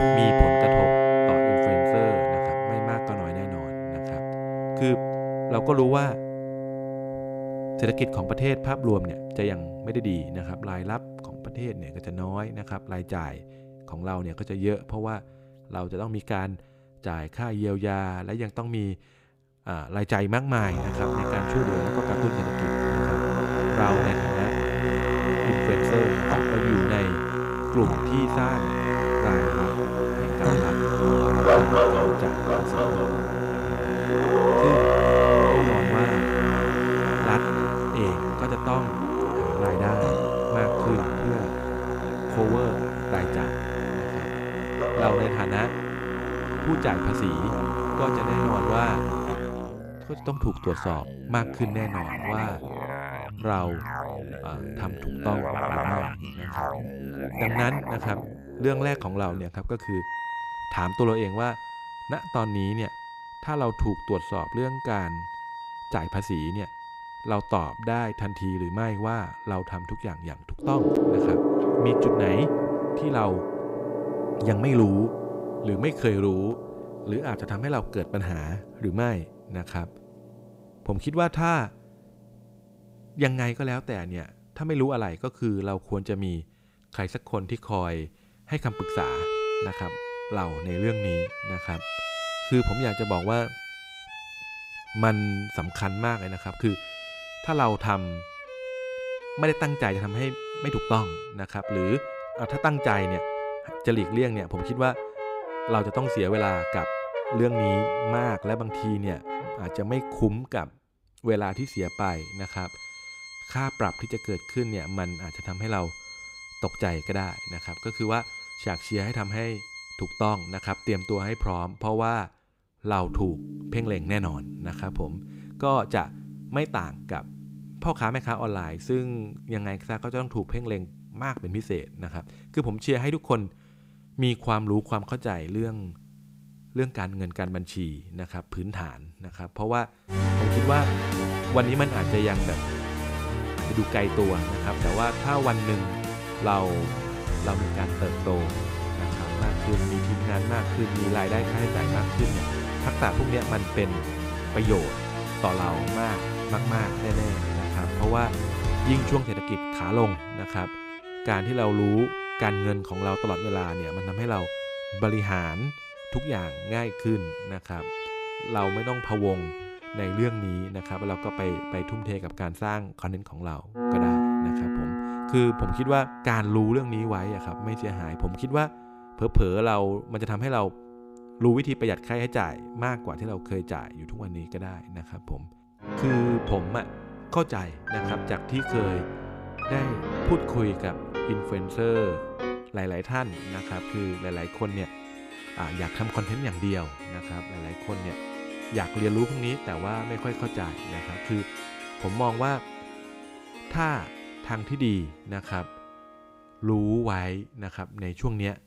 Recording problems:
background music; very loud; throughout; 1 dB above the speech

